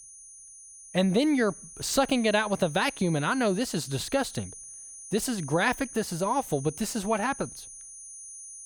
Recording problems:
high-pitched whine; noticeable; throughout; 9.5 kHz, 15 dB below the speech

